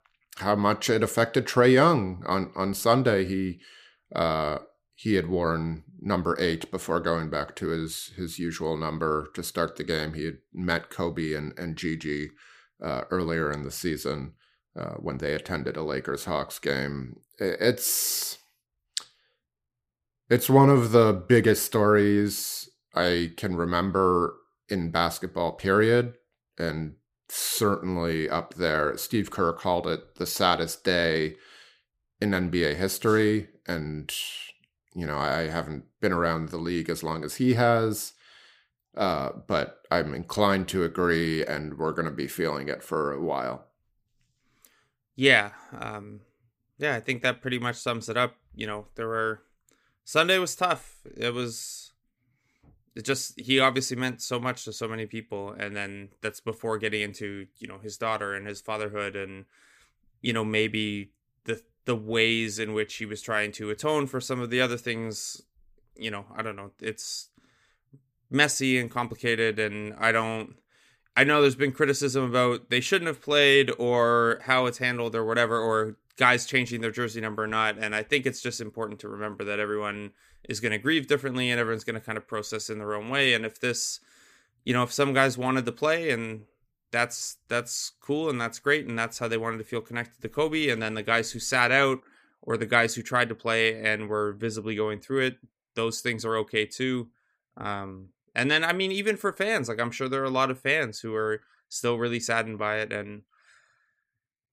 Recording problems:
none

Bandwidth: 15 kHz